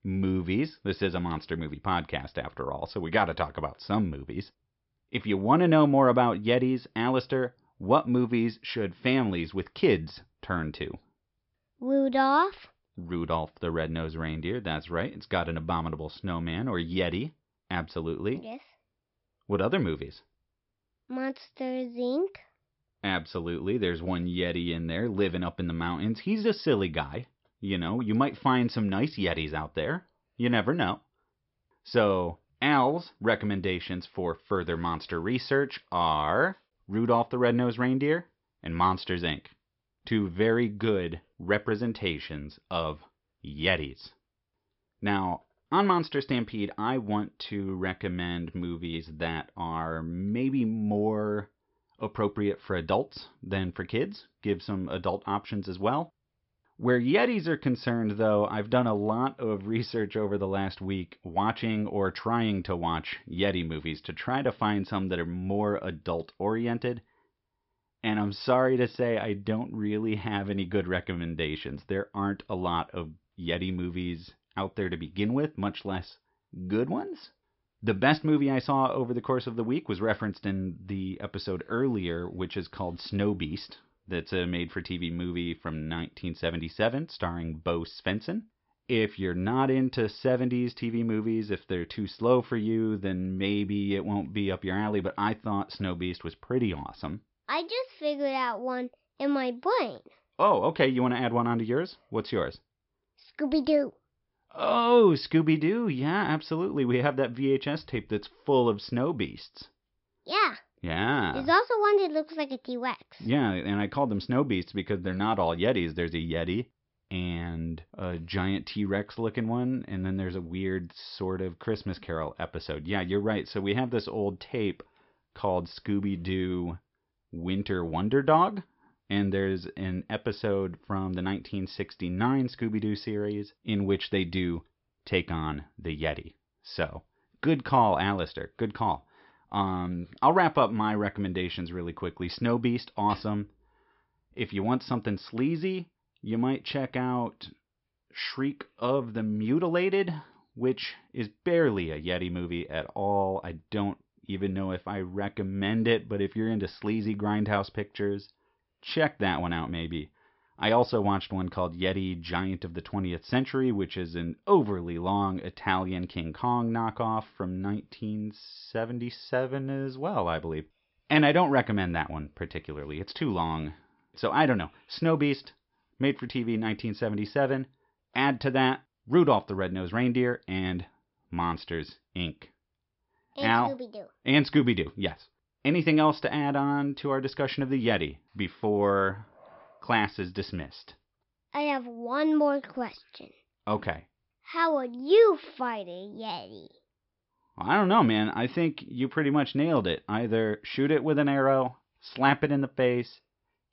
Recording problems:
high frequencies cut off; noticeable; nothing above 5.5 kHz

